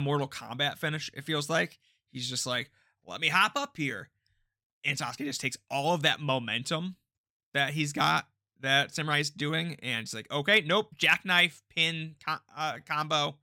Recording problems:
abrupt cut into speech; at the start
uneven, jittery; slightly; from 5 to 13 s

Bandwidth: 16.5 kHz